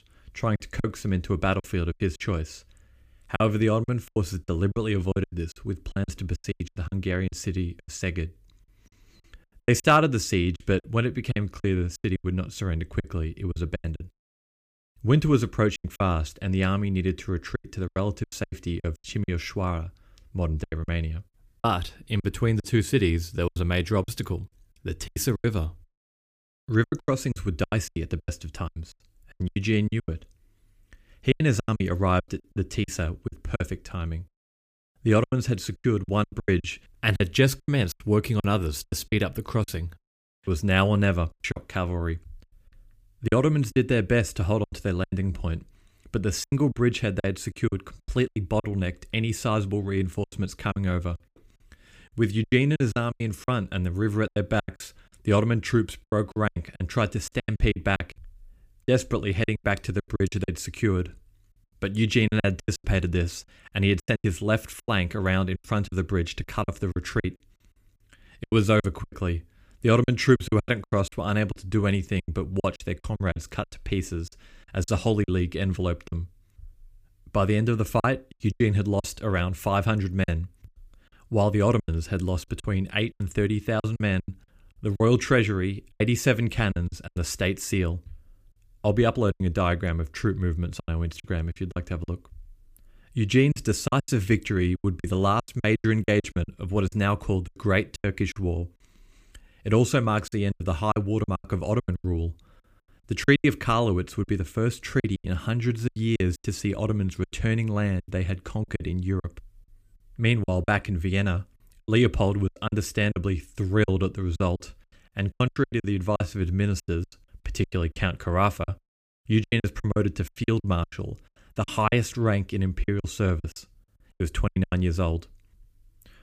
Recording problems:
choppy; very; 14% of the speech affected

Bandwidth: 15 kHz